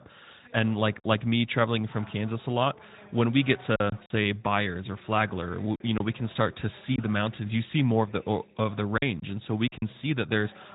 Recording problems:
high frequencies cut off; severe; nothing above 4 kHz
garbled, watery; slightly
voice in the background; faint; throughout; 25 dB below the speech
choppy; occasionally; 3% of the speech affected

